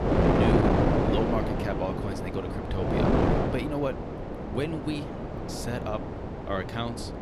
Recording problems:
wind noise on the microphone; heavy; 4 dB above the speech

